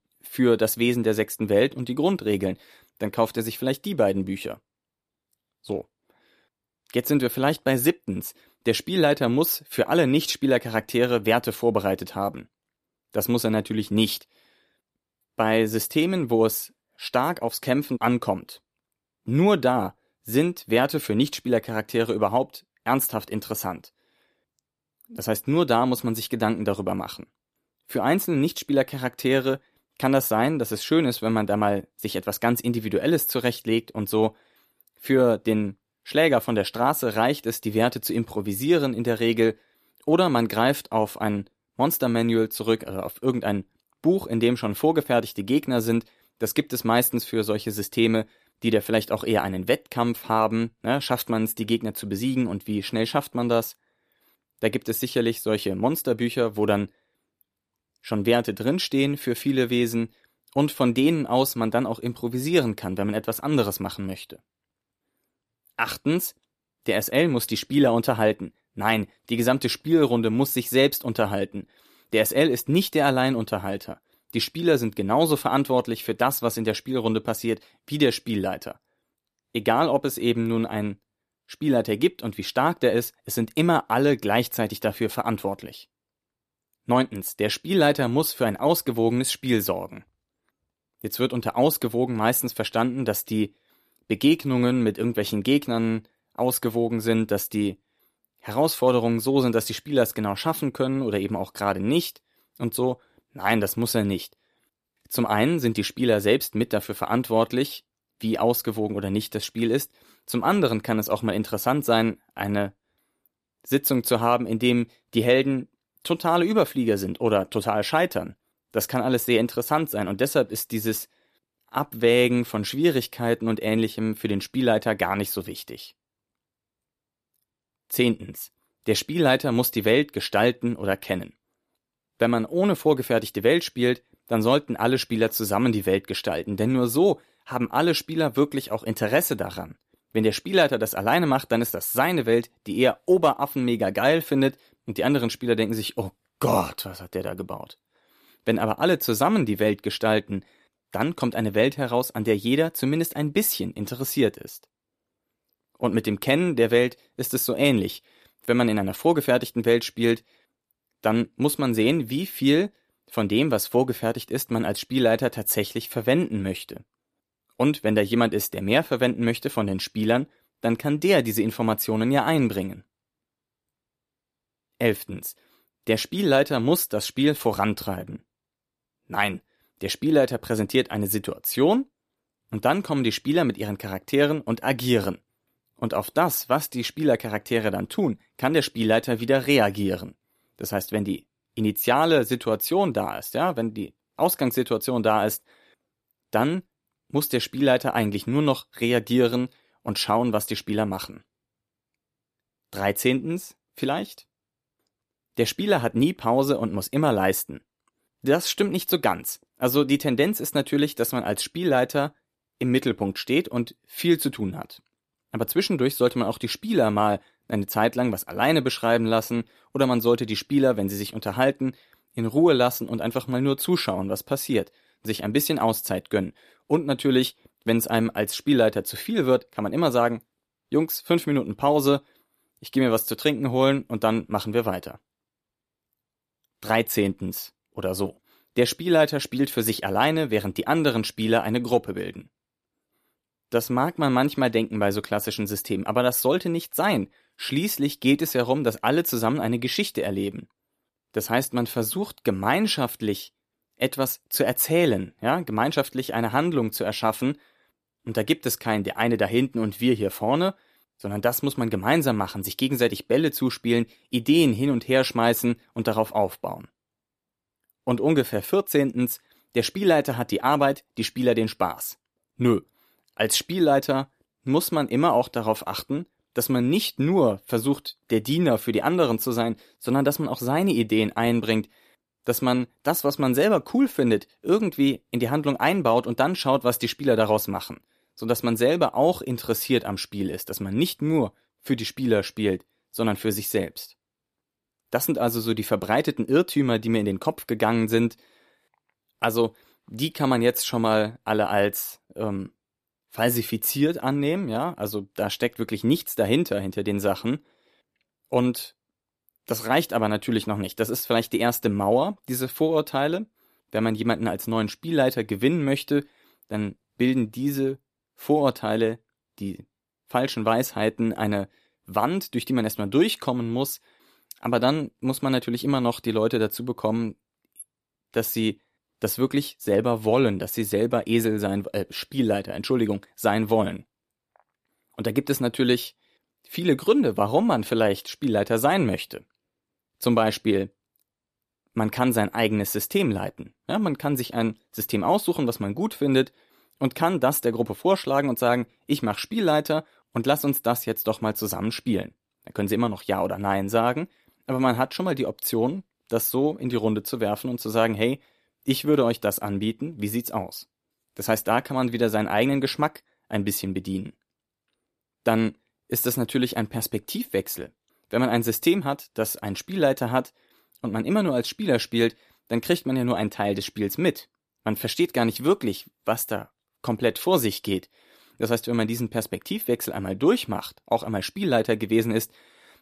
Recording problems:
none

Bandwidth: 14.5 kHz